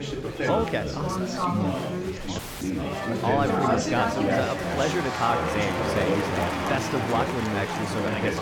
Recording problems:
chatter from many people; very loud; throughout; 2 dB above the speech
audio cutting out; at 2.5 s

